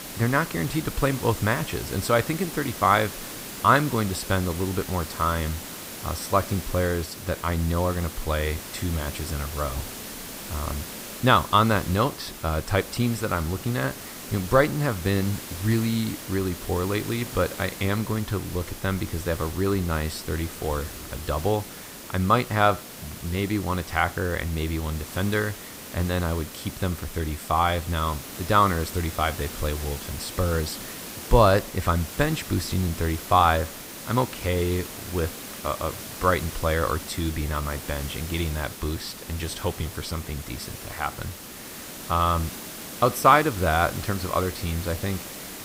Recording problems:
hiss; noticeable; throughout; 10 dB below the speech

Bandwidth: 15.5 kHz